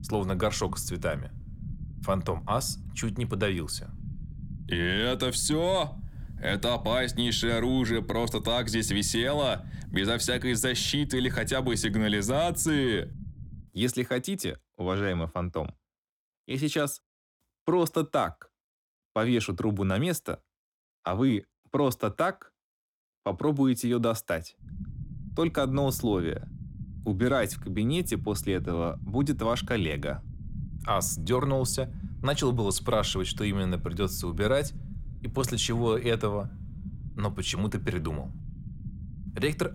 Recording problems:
low rumble; faint; until 14 s and from 25 s on; 20 dB below the speech

